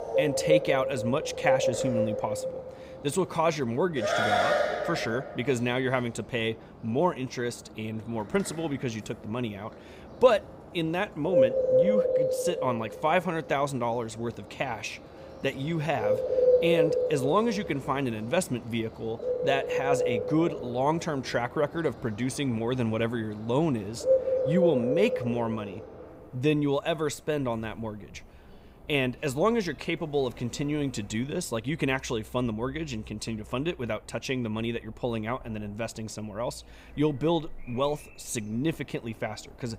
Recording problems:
animal sounds; very loud; throughout; 2 dB above the speech

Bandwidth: 15.5 kHz